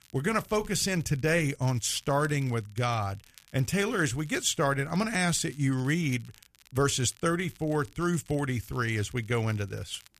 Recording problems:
crackle, like an old record; faint; 25 dB below the speech

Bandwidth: 14.5 kHz